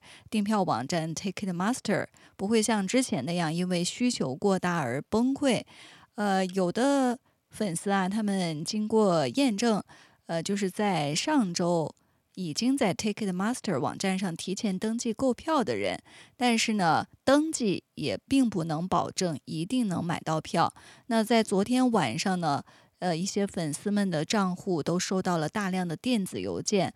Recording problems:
none

